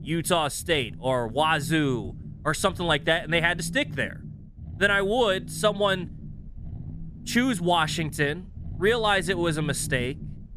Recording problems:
low rumble; faint; throughout; 25 dB below the speech

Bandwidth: 14.5 kHz